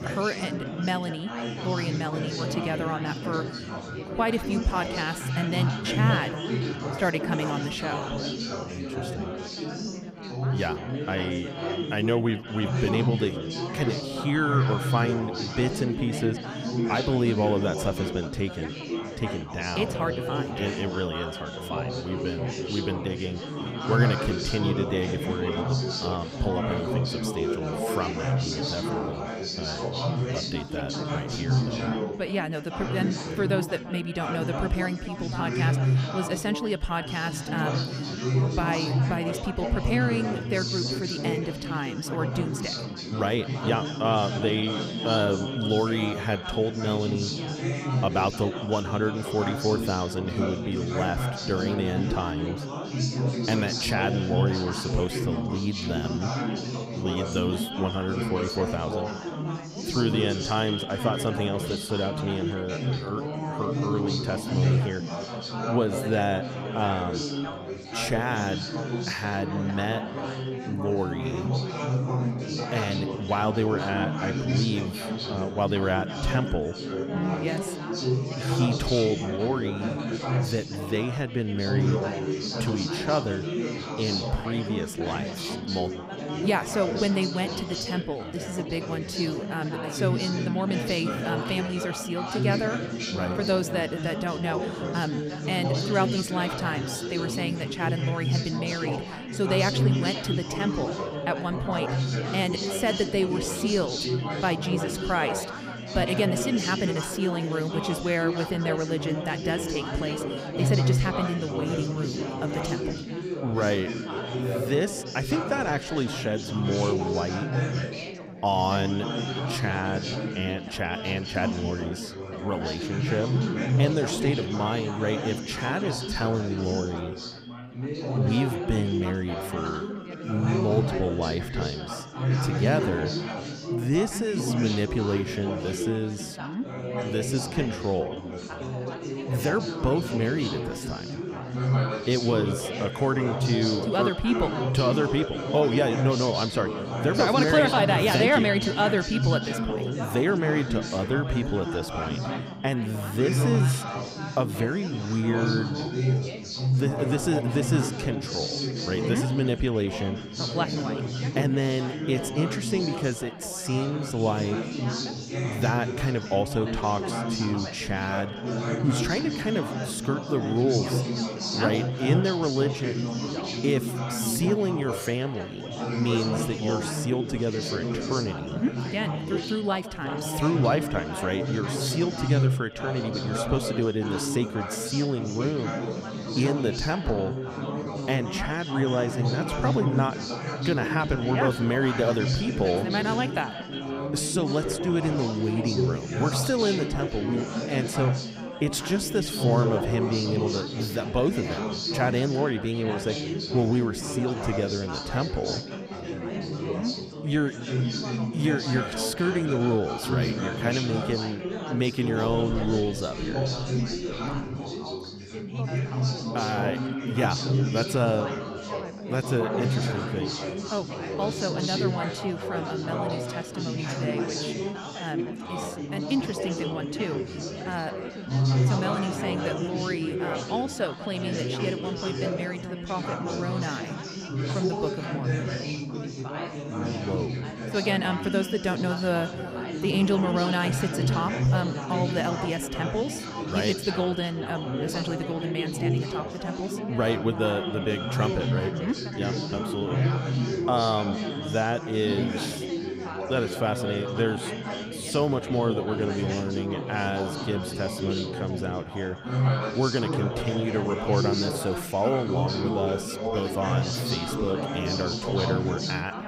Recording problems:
echo of what is said; noticeable; throughout; 180 ms later, 15 dB below the speech
chatter from many people; loud; throughout; 2 dB below the speech

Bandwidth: 15.5 kHz